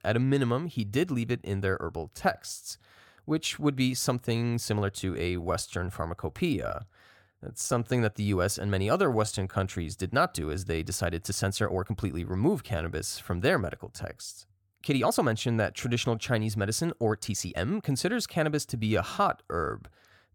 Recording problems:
uneven, jittery; strongly; from 2 to 20 s

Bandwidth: 17.5 kHz